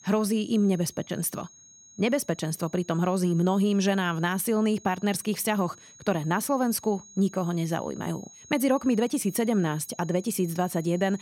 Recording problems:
high-pitched whine; faint; throughout; 6.5 kHz, 20 dB below the speech

